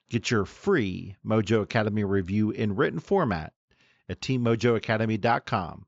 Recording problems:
high frequencies cut off; noticeable; nothing above 7.5 kHz

